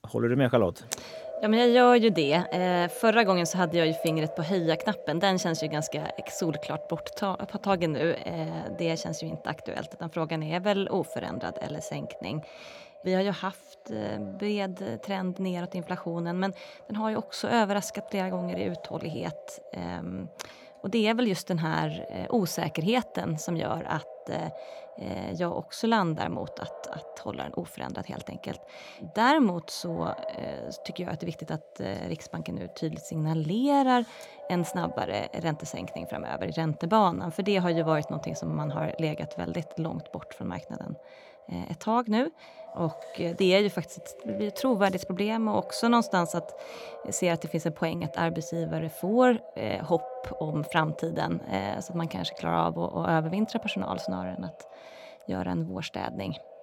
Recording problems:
echo of what is said; noticeable; throughout; 220 ms later, 15 dB below the speech

